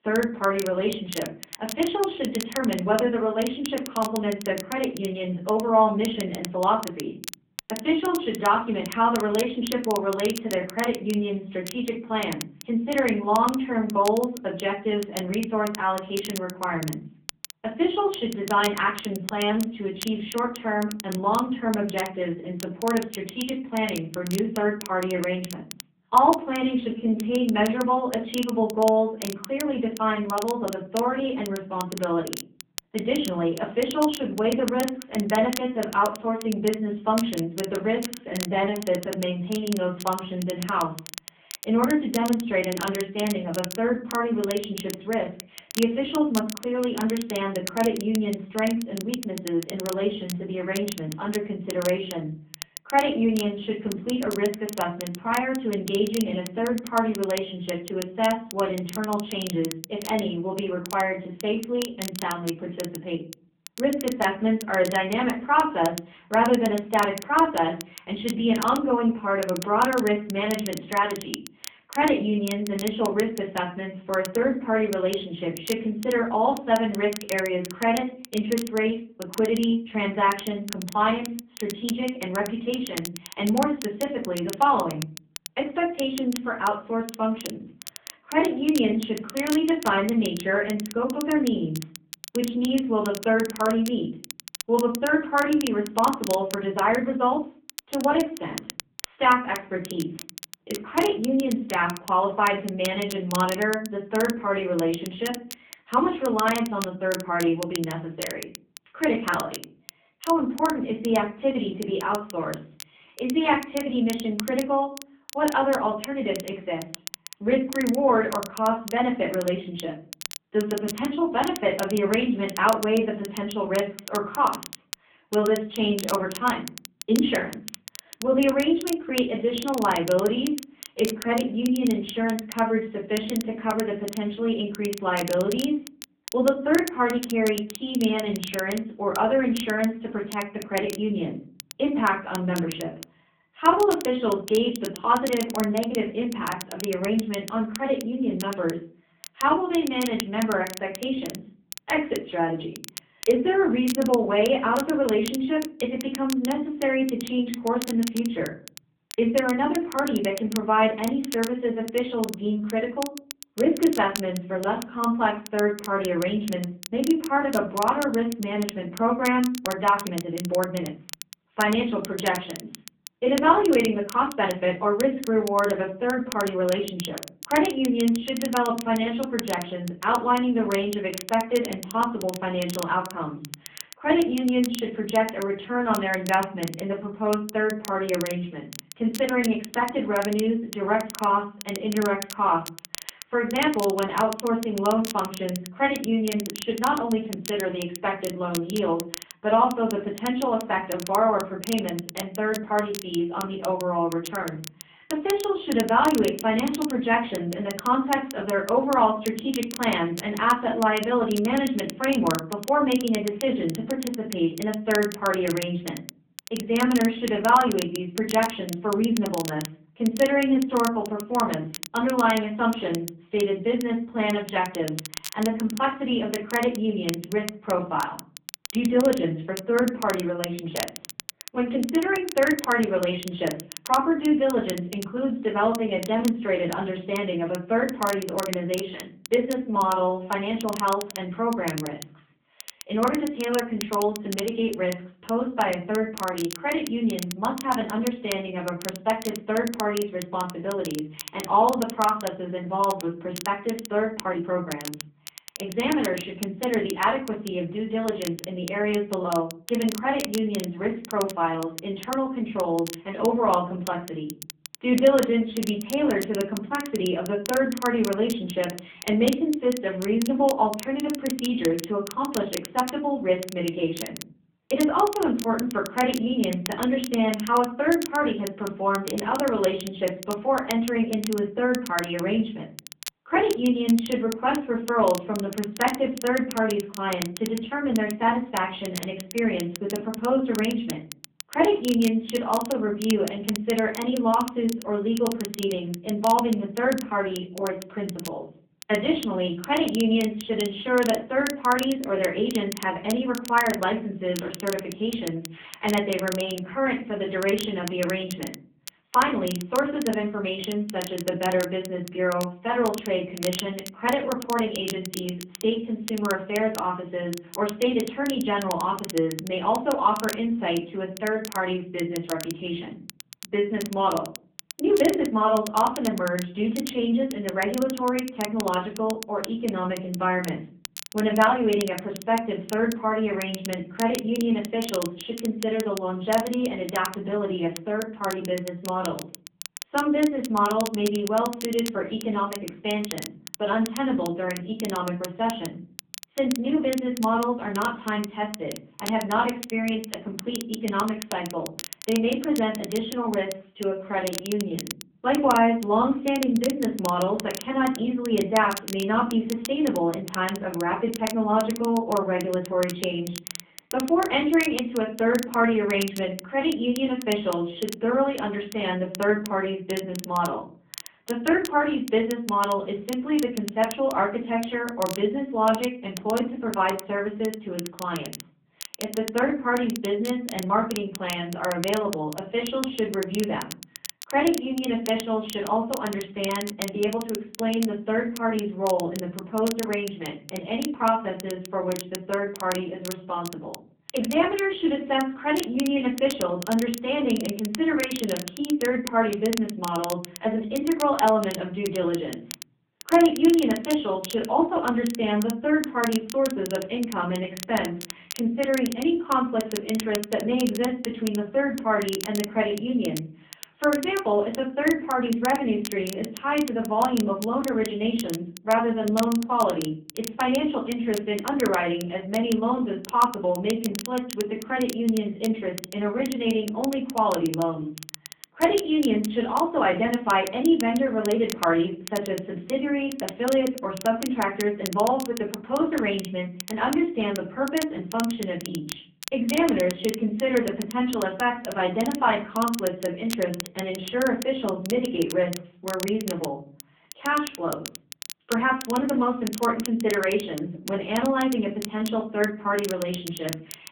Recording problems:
off-mic speech; far
room echo; slight; dies away in 0.4 s
phone-call audio; nothing above 3.5 kHz
crackle, like an old record; noticeable; 15 dB below the speech
uneven, jittery; strongly; from 19 s to 5:55

